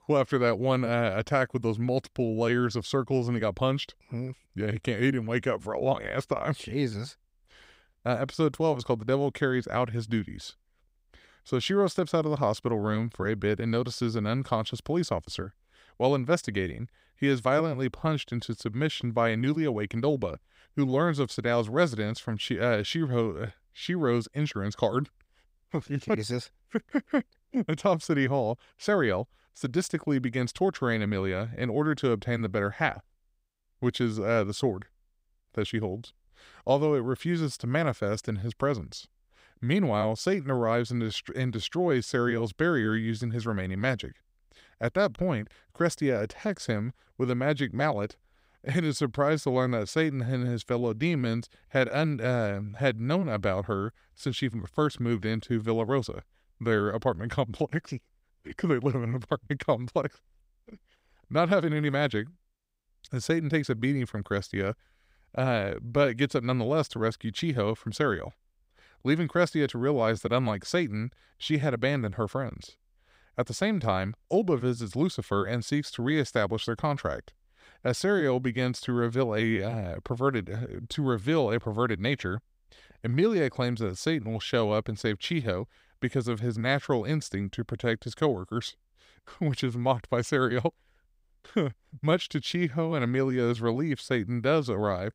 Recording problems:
none

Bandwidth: 15.5 kHz